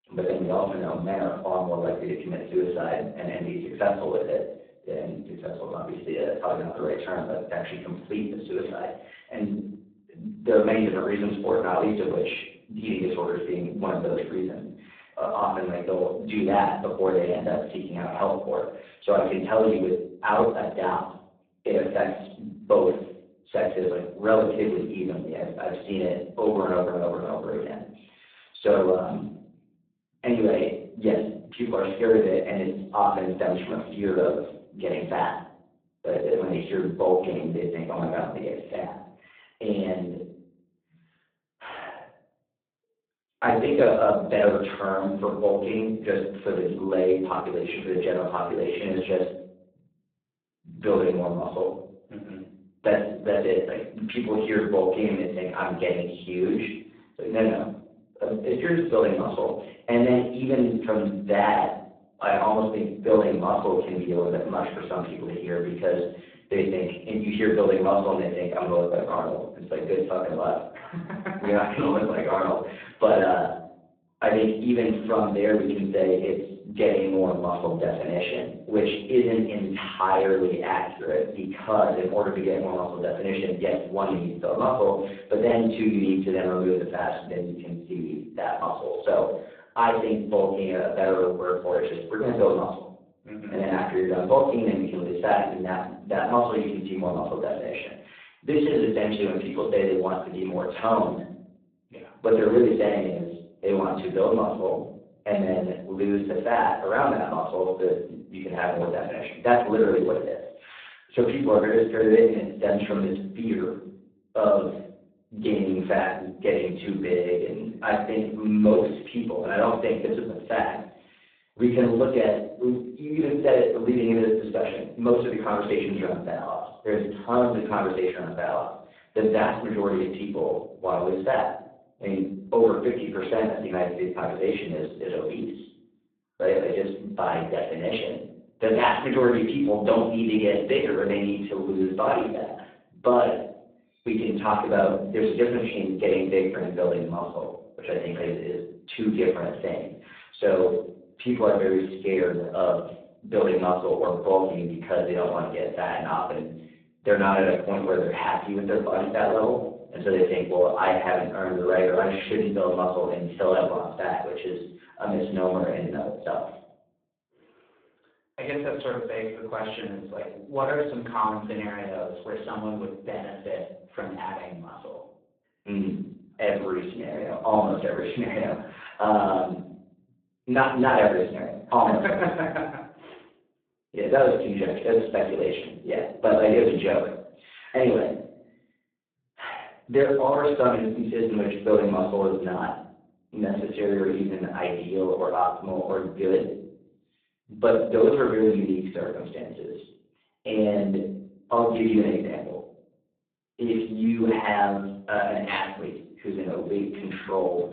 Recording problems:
phone-call audio; poor line; nothing above 3.5 kHz
off-mic speech; far
room echo; noticeable; dies away in 0.5 s

